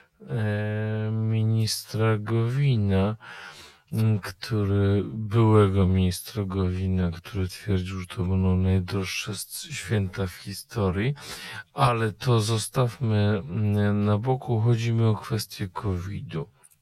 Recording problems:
wrong speed, natural pitch; too slow; 0.5 times normal speed

